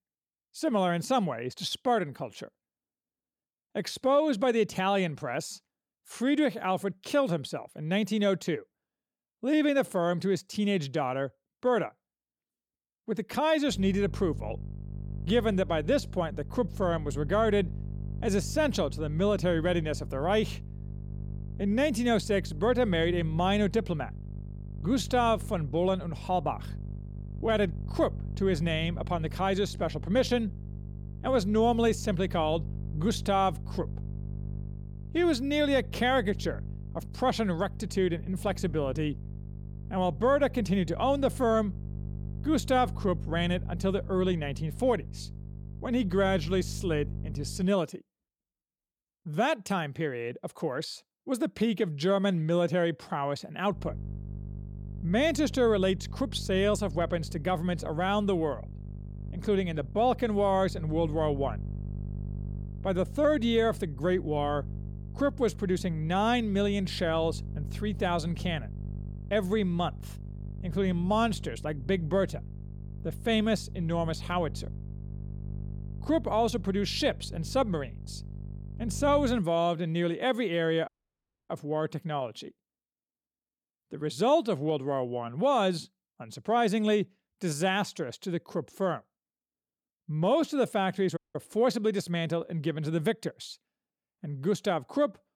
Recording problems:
electrical hum; faint; from 14 to 48 s and from 54 s to 1:19; 50 Hz, 20 dB below the speech
audio cutting out; at 1:21 for 0.5 s and at 1:31

